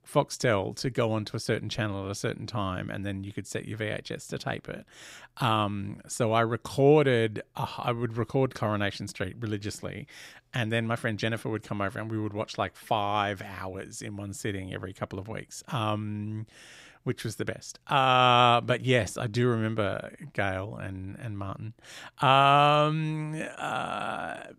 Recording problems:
none

